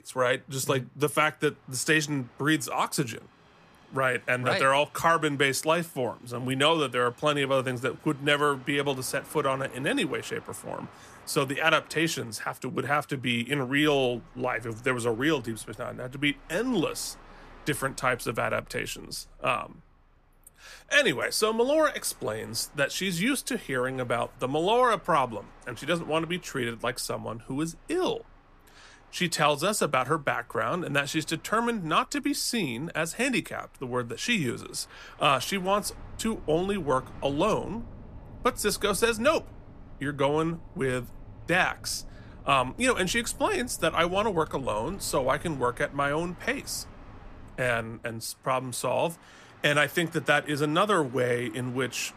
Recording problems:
train or aircraft noise; faint; throughout; 25 dB below the speech

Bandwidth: 14.5 kHz